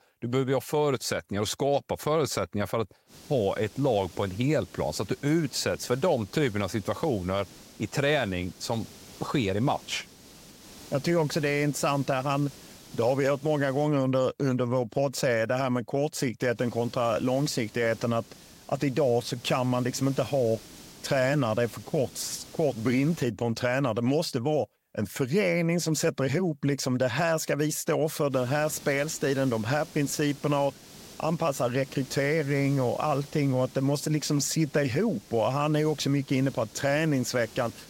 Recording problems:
hiss; faint; from 3 to 14 s, from 17 to 23 s and from 28 s on; 20 dB below the speech

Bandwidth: 16 kHz